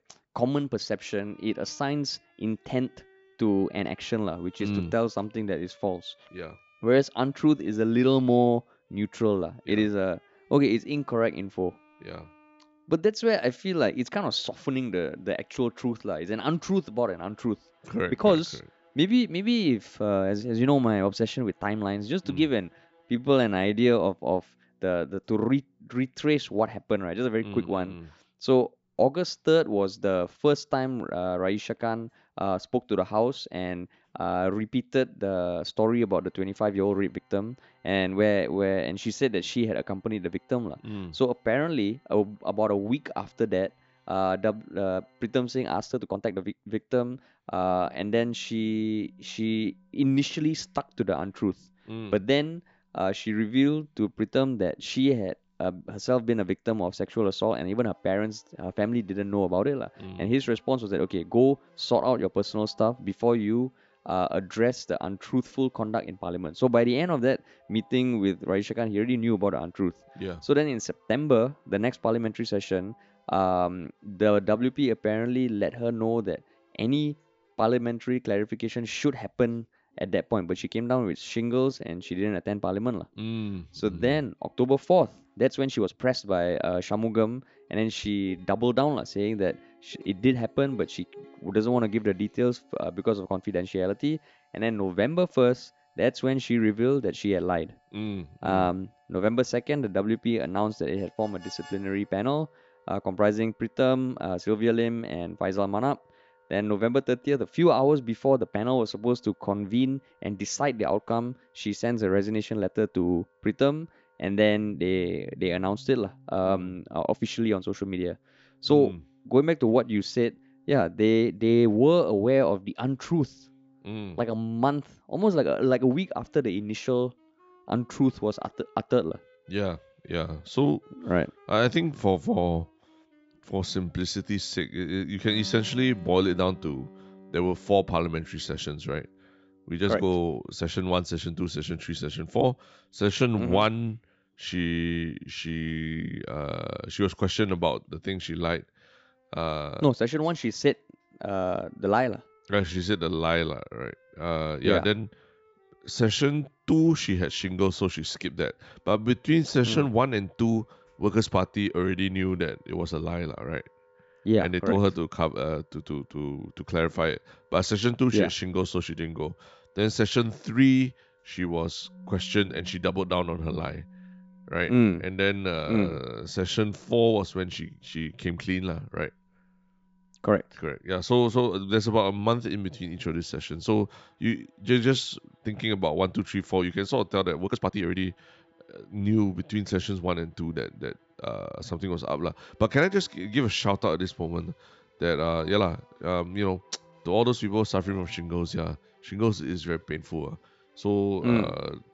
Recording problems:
high frequencies cut off; noticeable; nothing above 8 kHz
background music; faint; throughout; 30 dB below the speech
uneven, jittery; strongly; from 13 s to 3:20

